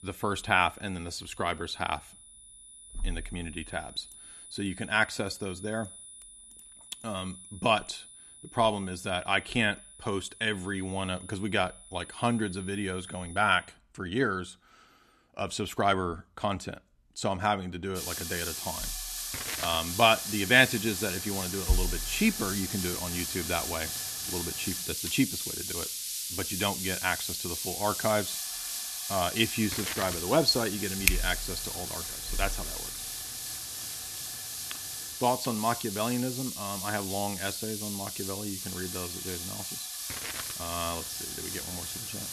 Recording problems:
hiss; loud; from 18 s on; 3 dB below the speech
high-pitched whine; noticeable; until 14 s and from 24 s on; 10 kHz, 15 dB below the speech

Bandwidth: 13.5 kHz